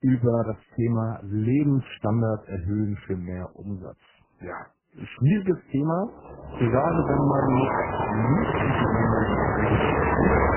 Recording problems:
garbled, watery; badly; nothing above 3 kHz
traffic noise; very loud; from 6.5 s on; 1 dB above the speech

